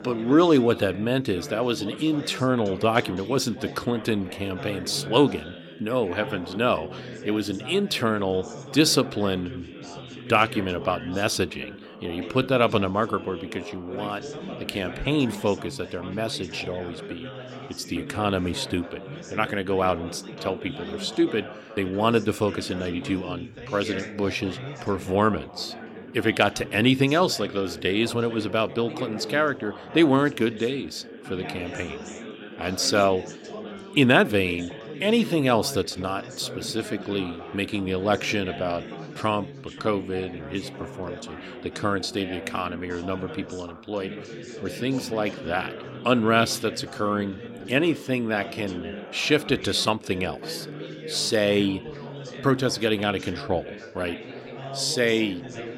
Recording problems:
background chatter; noticeable; throughout; 4 voices, 15 dB below the speech

